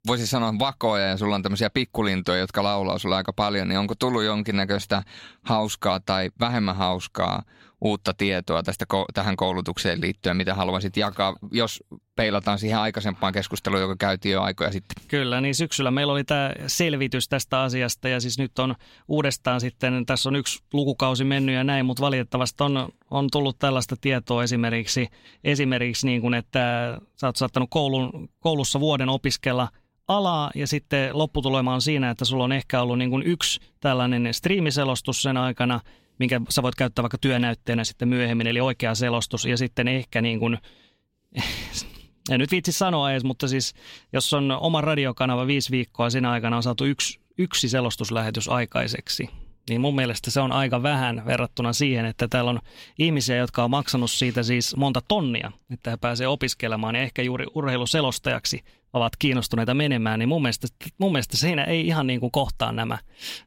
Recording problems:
none

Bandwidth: 16 kHz